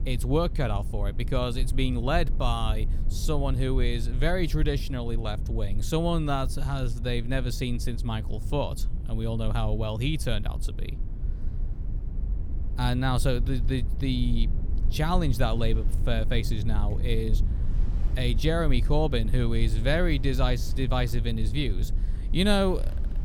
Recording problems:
low rumble; noticeable; throughout; 15 dB below the speech
rain or running water; faint; throughout; 30 dB below the speech

